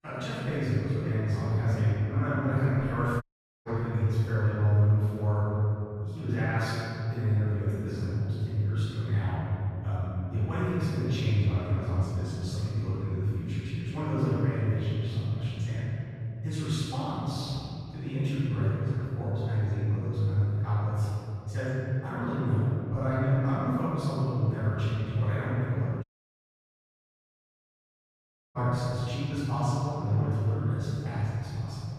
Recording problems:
room echo; strong; dies away in 3 s
off-mic speech; far
audio cutting out; at 3 s and at 26 s for 2.5 s

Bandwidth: 14.5 kHz